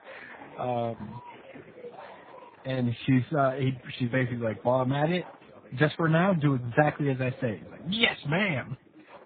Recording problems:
garbled, watery; badly; nothing above 3.5 kHz
chatter from many people; faint; throughout; 20 dB below the speech

